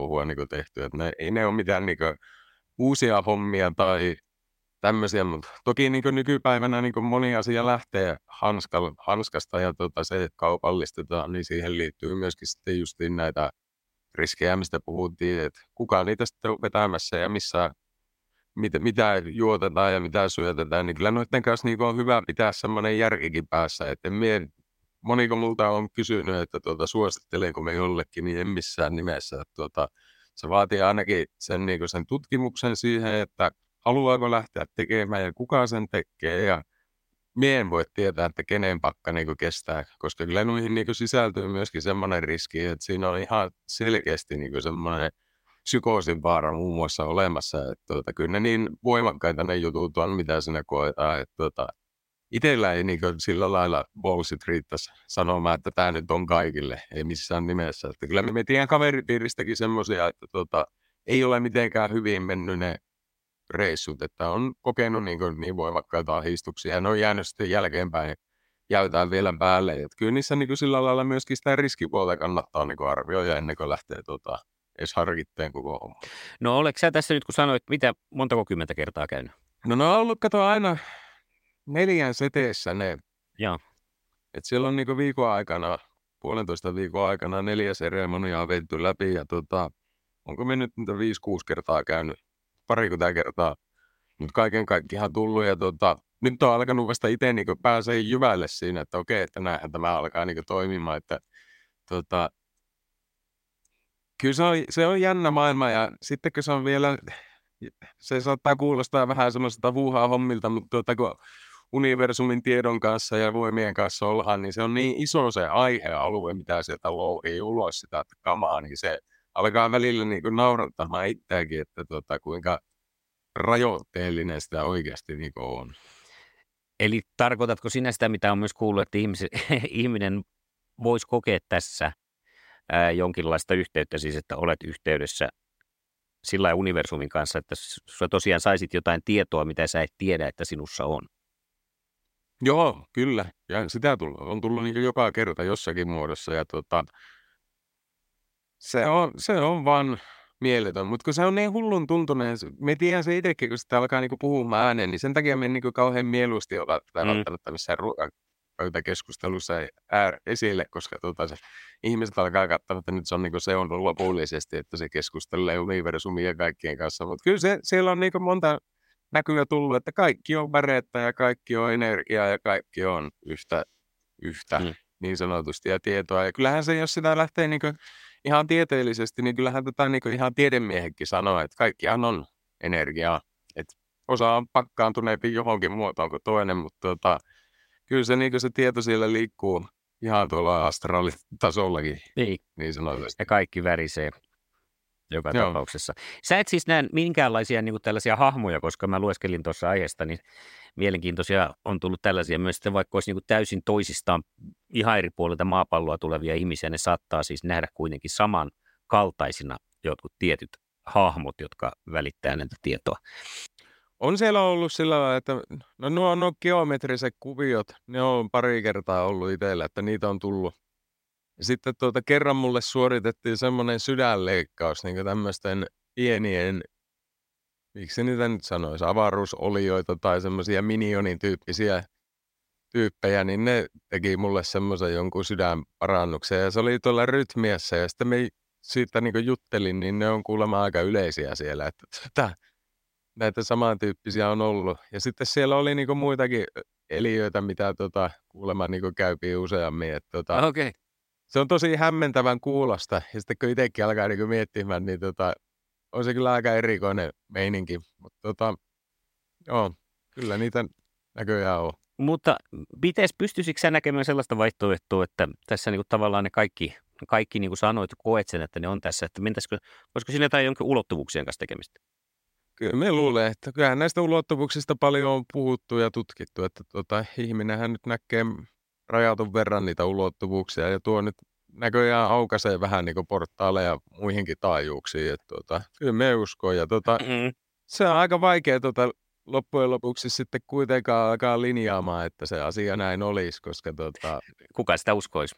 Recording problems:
abrupt cut into speech; at the start

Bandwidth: 16 kHz